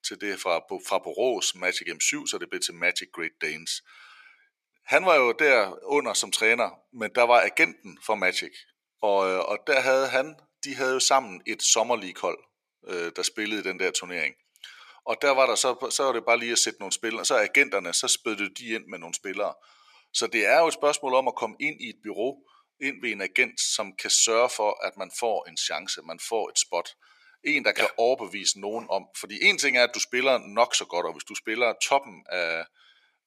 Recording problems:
thin; somewhat; fading below 550 Hz

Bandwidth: 14.5 kHz